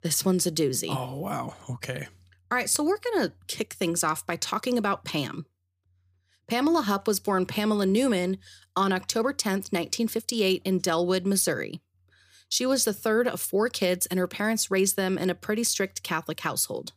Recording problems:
none

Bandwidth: 15 kHz